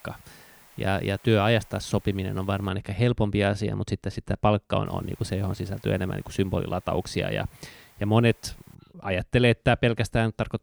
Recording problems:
hiss; faint; until 2.5 s and from 5 to 9 s; 25 dB below the speech

